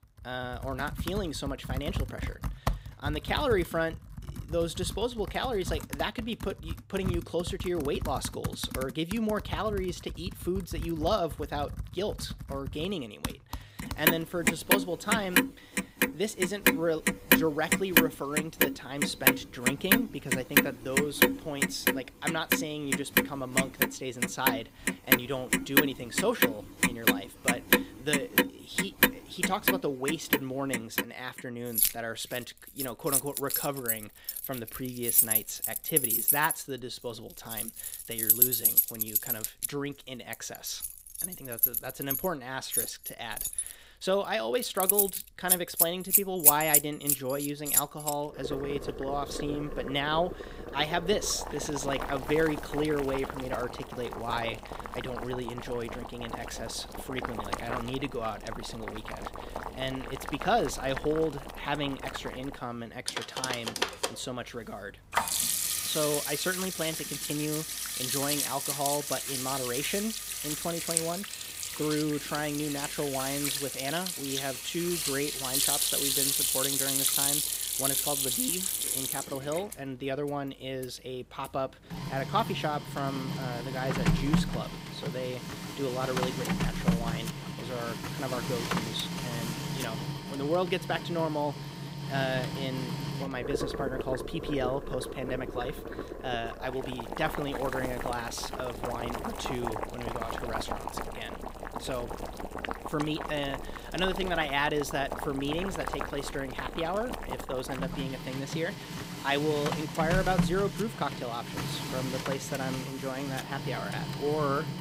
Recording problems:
household noises; very loud; throughout; 3 dB above the speech

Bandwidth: 15.5 kHz